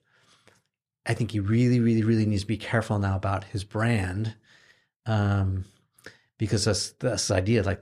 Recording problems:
none

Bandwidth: 14.5 kHz